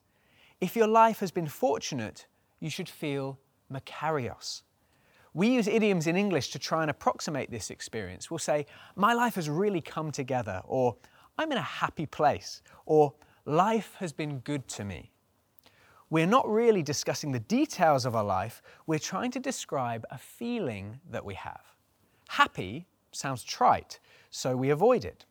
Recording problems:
none

